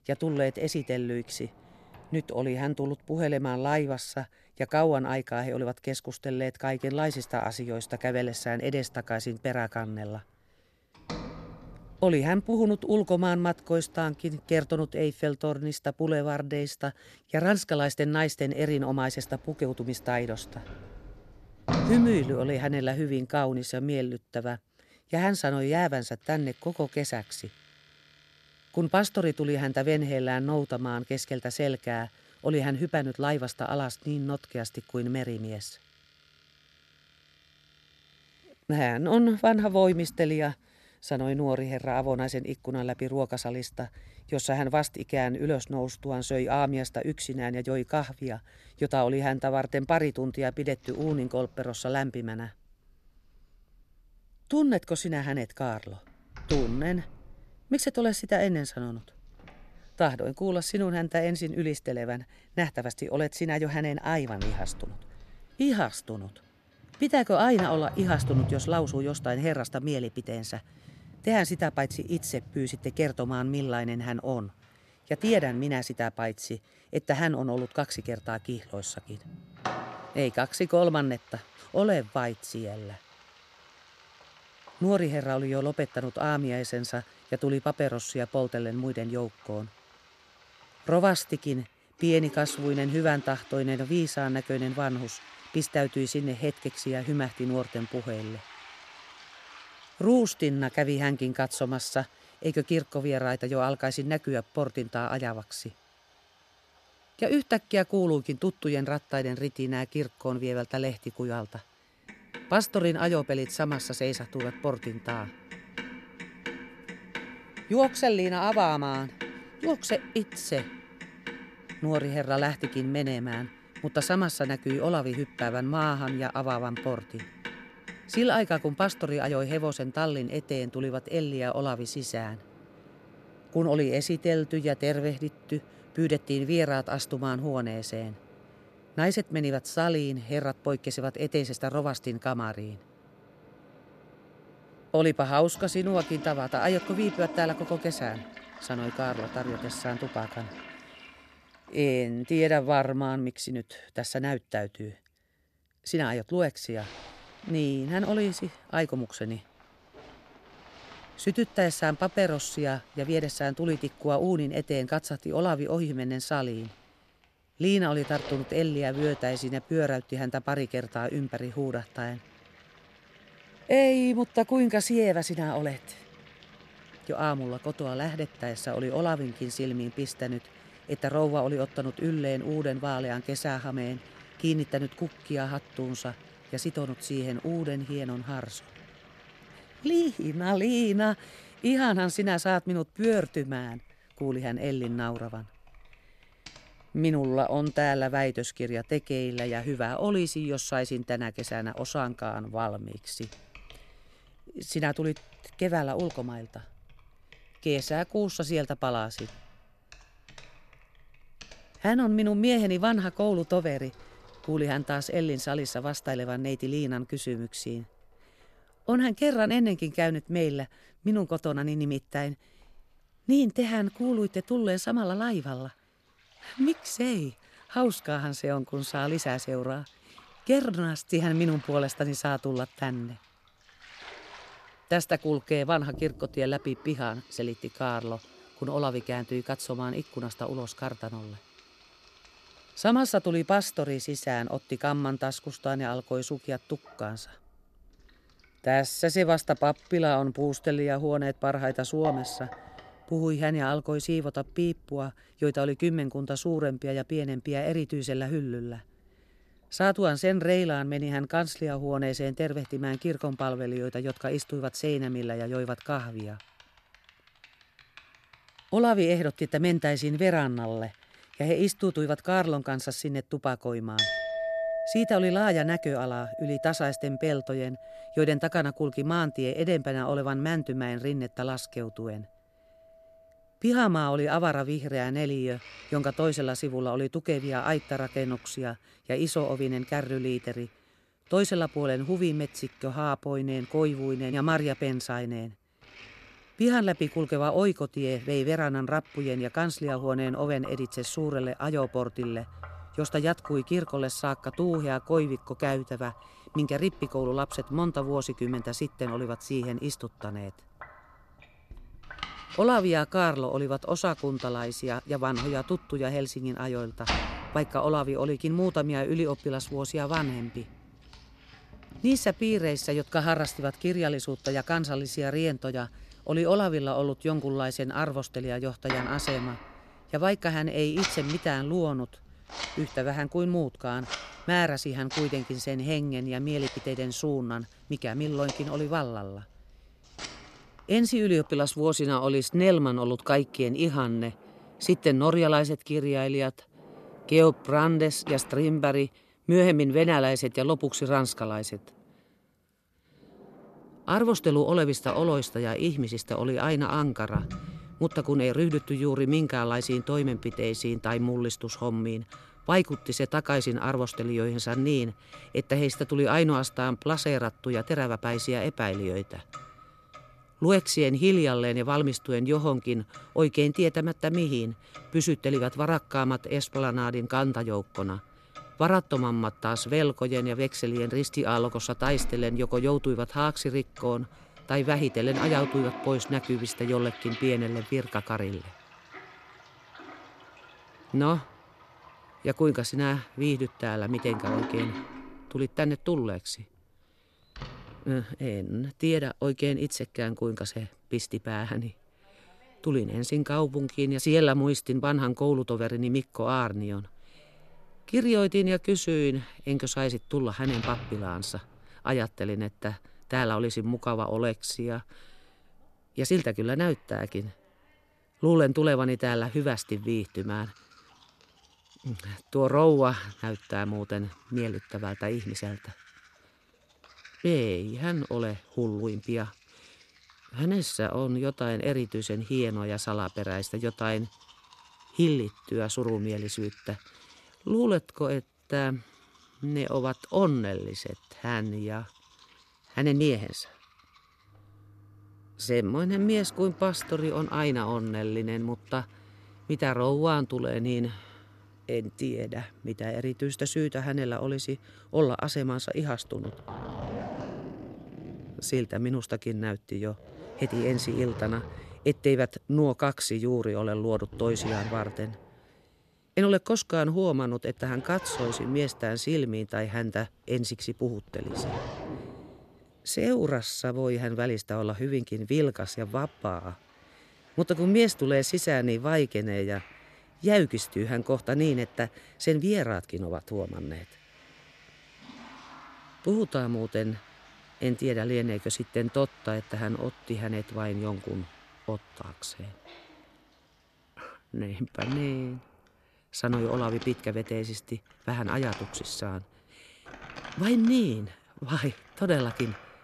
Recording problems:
household noises; noticeable; throughout; 15 dB below the speech

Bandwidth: 13.5 kHz